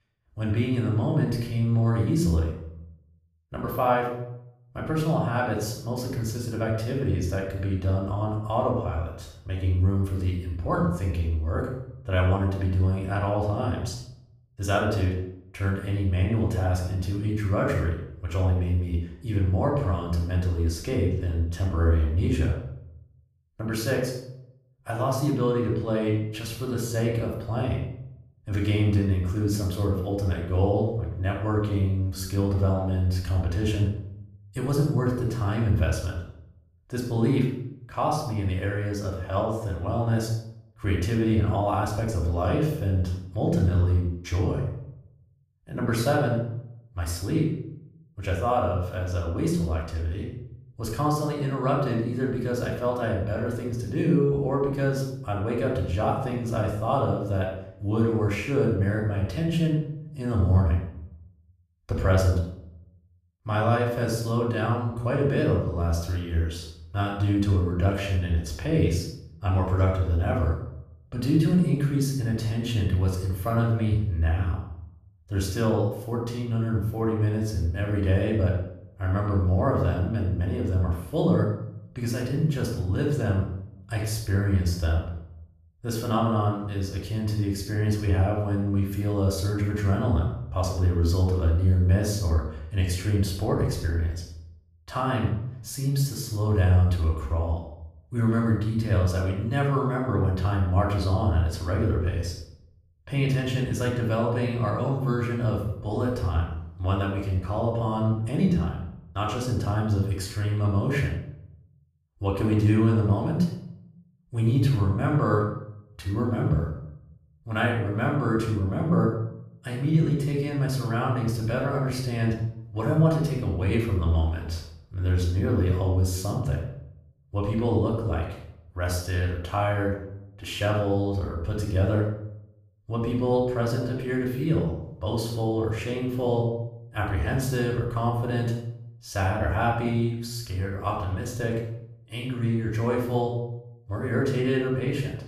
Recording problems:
off-mic speech; far
room echo; noticeable; dies away in 0.6 s

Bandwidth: 14.5 kHz